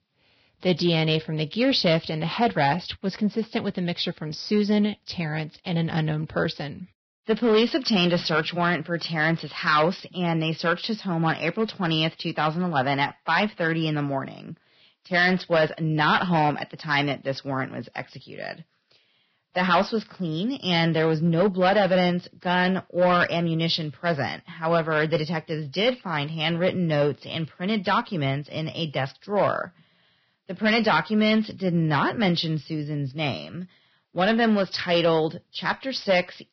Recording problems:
garbled, watery; badly; nothing above 5.5 kHz
distortion; slight; 3% of the sound clipped

